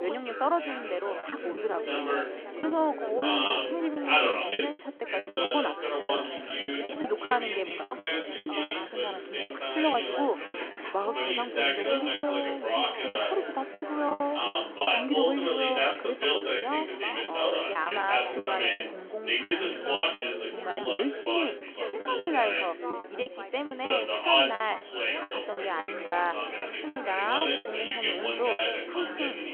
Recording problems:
phone-call audio
chatter from many people; very loud; throughout; 3 dB above the speech
traffic noise; noticeable; throughout; 20 dB below the speech
choppy; very; 13% of the speech affected
abrupt cut into speech; at the start

